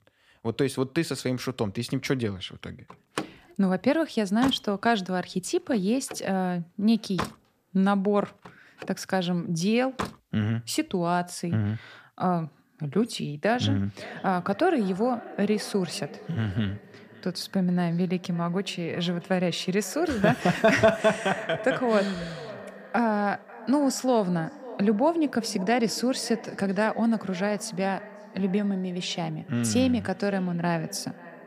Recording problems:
echo of what is said; noticeable; from 14 s on; 540 ms later, 15 dB below the speech
door banging; noticeable; from 3 to 10 s; peak 7 dB below the speech

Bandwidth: 15 kHz